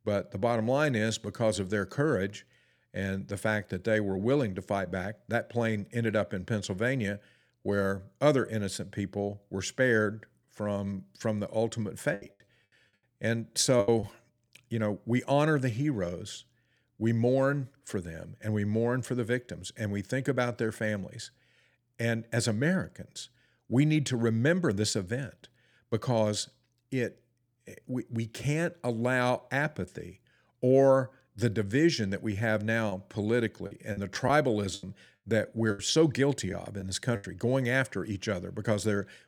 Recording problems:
choppy; very; from 12 to 14 s and from 33 to 37 s; 13% of the speech affected

